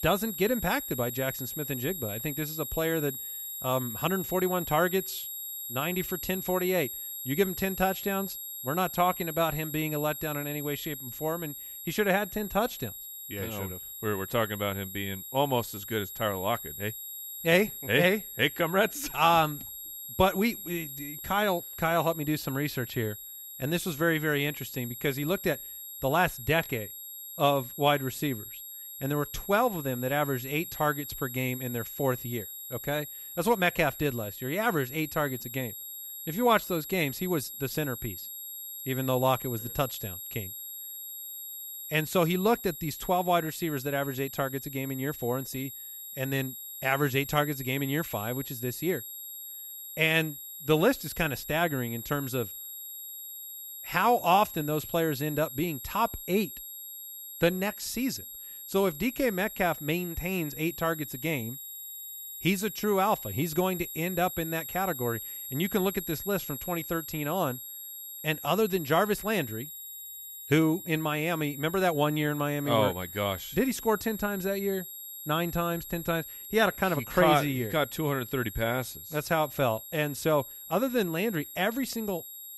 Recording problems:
high-pitched whine; loud; throughout; 11.5 kHz, 9 dB below the speech

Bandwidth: 15.5 kHz